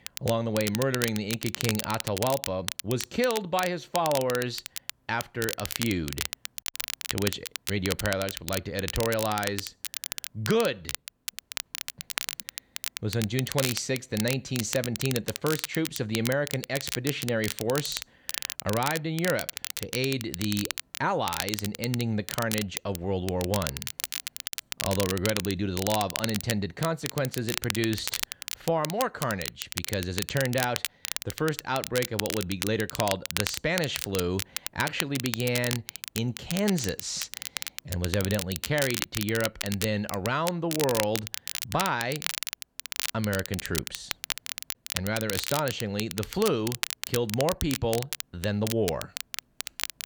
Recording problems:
crackle, like an old record; loud; 4 dB below the speech

